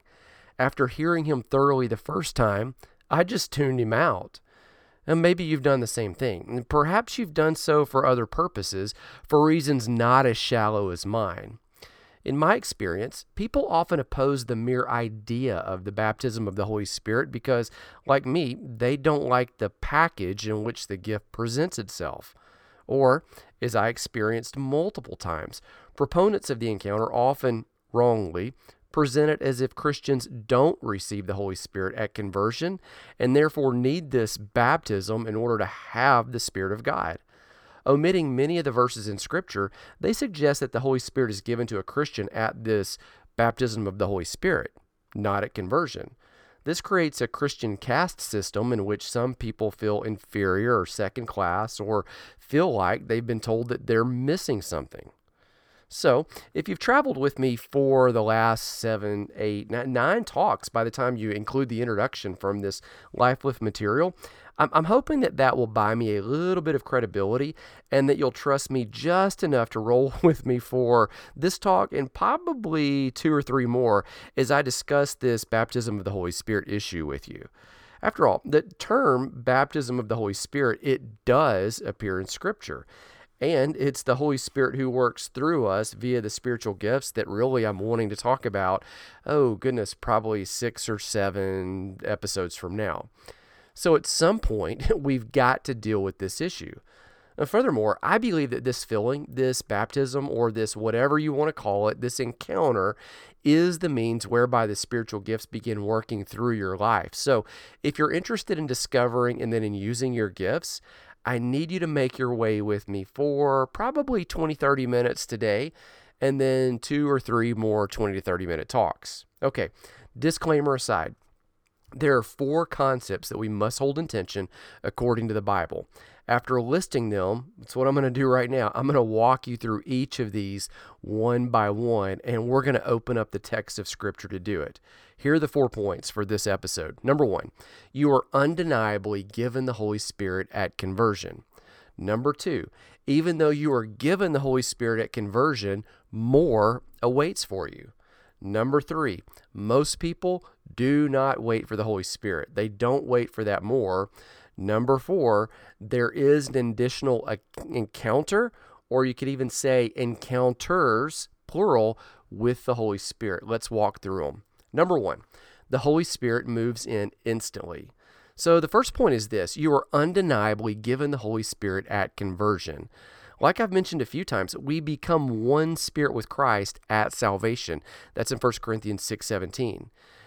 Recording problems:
none

